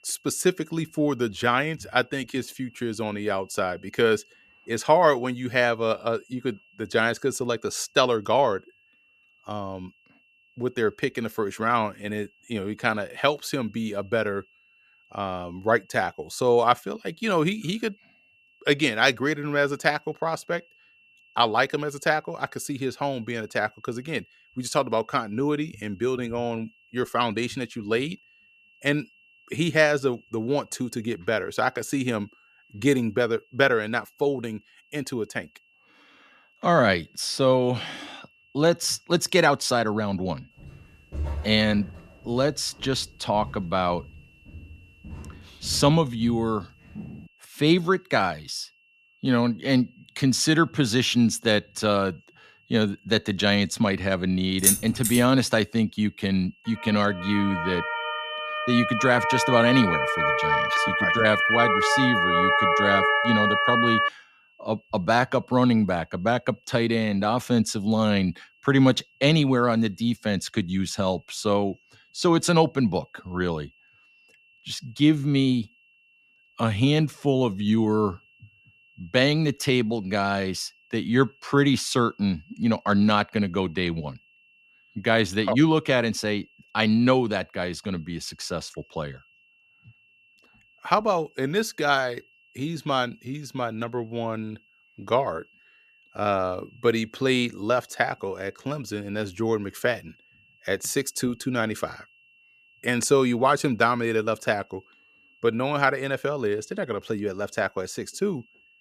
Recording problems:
high-pitched whine; faint; throughout; 2.5 kHz, 30 dB below the speech
footsteps; noticeable; from 41 to 47 s; peak 7 dB below the speech
jangling keys; loud; at 55 s; peak 5 dB above the speech
siren; loud; from 57 s to 1:04; peak 5 dB above the speech

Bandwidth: 14.5 kHz